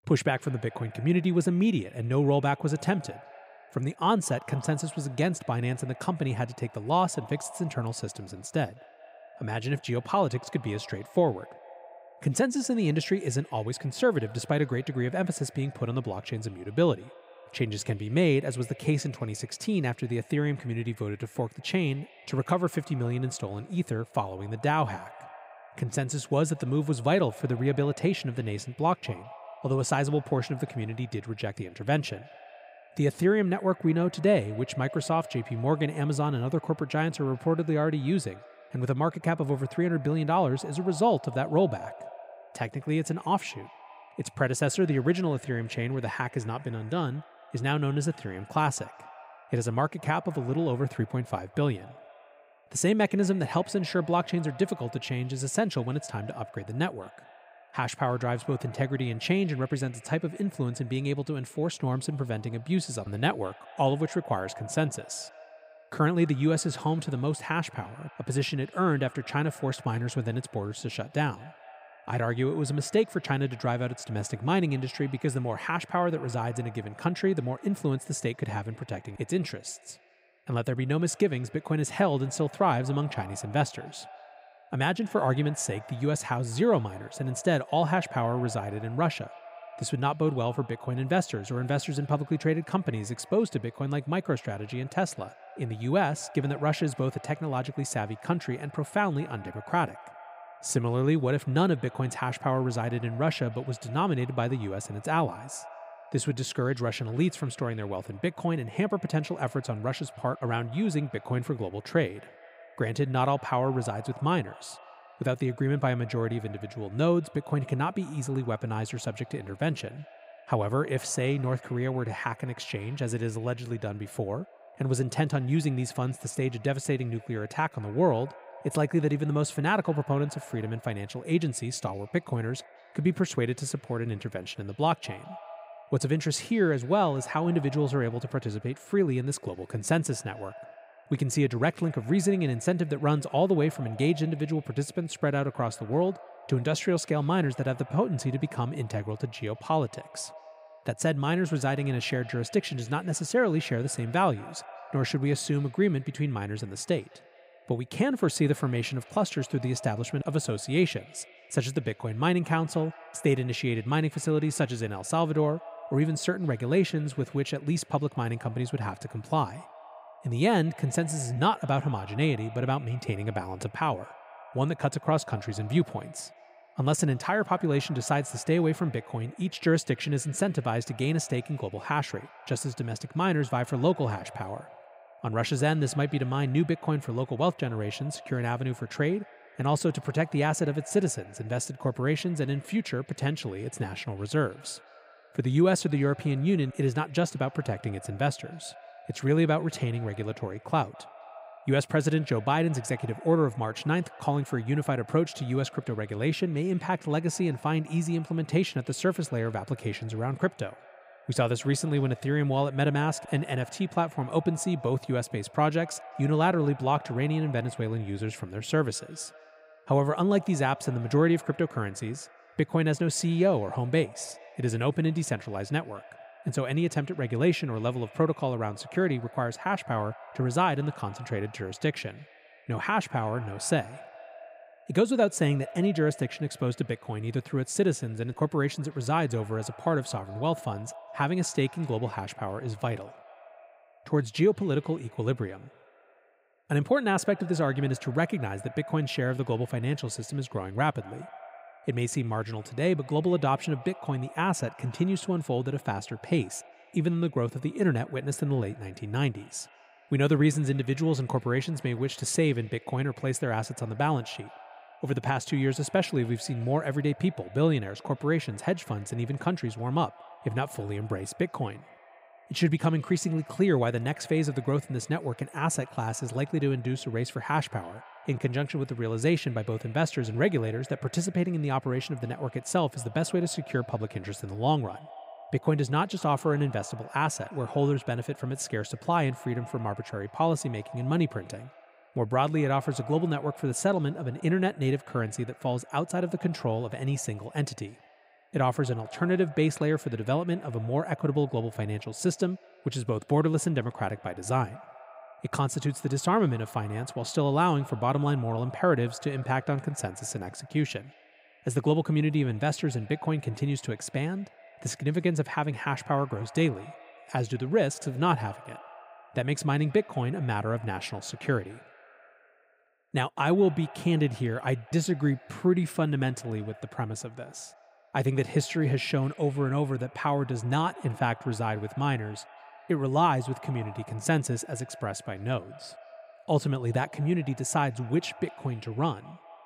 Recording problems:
echo of what is said; faint; throughout; 210 ms later, 20 dB below the speech

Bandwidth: 15.5 kHz